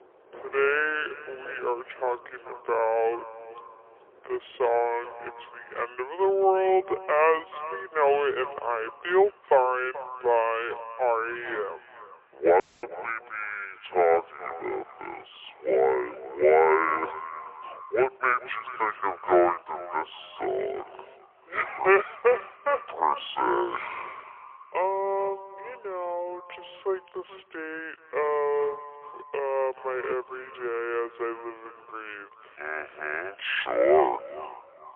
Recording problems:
phone-call audio; poor line; nothing above 3.5 kHz
wrong speed and pitch; too slow and too low; 0.6 times normal speed
echo of what is said; noticeable; throughout; 430 ms later, 15 dB below the speech
rain or running water; faint; throughout; 25 dB below the speech
audio cutting out; at 13 s

